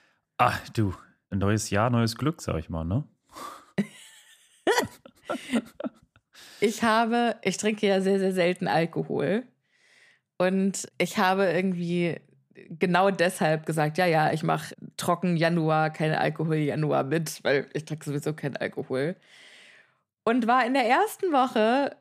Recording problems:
none

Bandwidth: 15 kHz